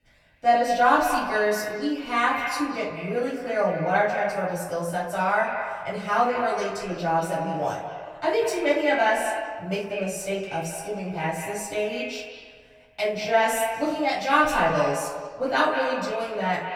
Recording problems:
echo of what is said; strong; throughout; 180 ms later, 6 dB below the speech
off-mic speech; far
room echo; noticeable; dies away in 0.6 s

